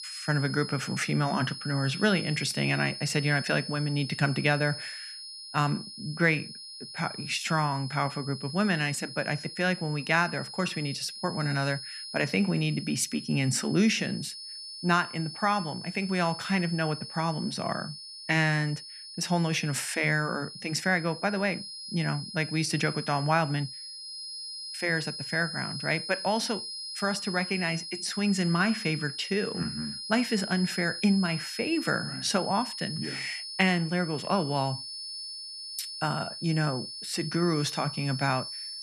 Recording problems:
high-pitched whine; loud; throughout; 5 kHz, 9 dB below the speech

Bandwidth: 14 kHz